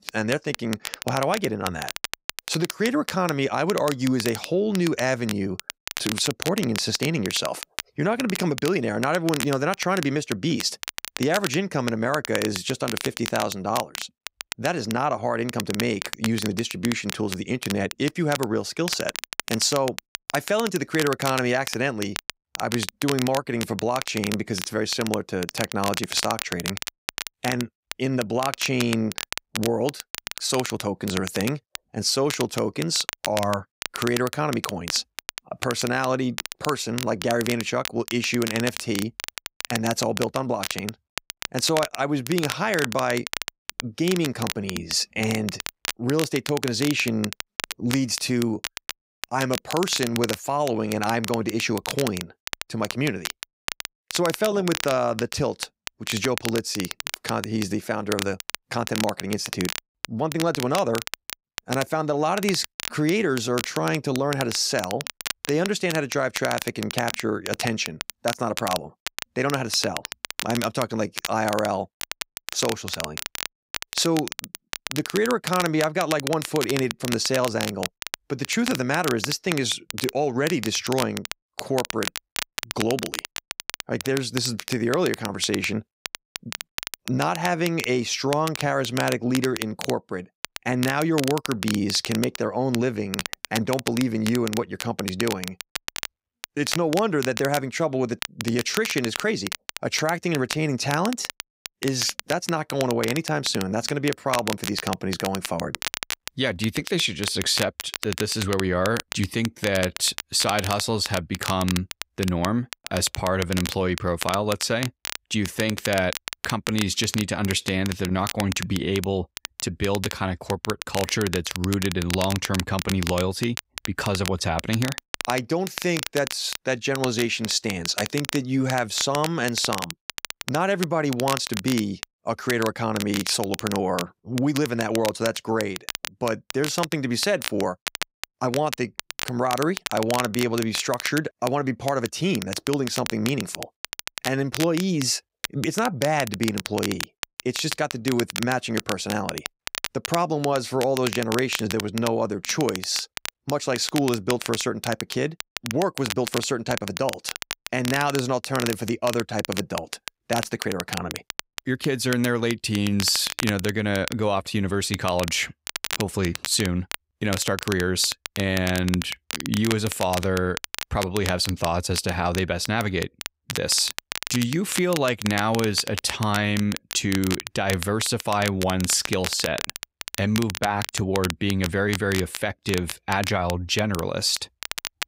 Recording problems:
crackle, like an old record; loud; 7 dB below the speech

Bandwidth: 15.5 kHz